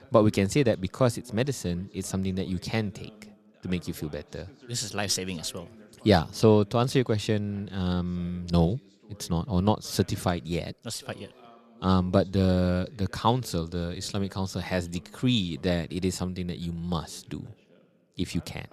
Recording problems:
voice in the background; faint; throughout; 25 dB below the speech

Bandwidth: 13.5 kHz